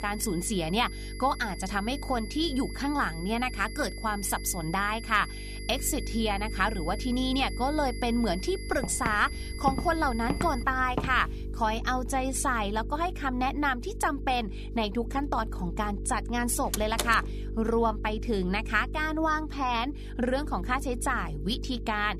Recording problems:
electrical hum; noticeable; throughout; 50 Hz, 20 dB below the speech
high-pitched whine; noticeable; until 11 s; 2 kHz, 15 dB below the speech
footsteps; noticeable; from 8.5 to 12 s; peak 5 dB below the speech
door banging; noticeable; at 17 s; peak 3 dB below the speech

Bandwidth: 14.5 kHz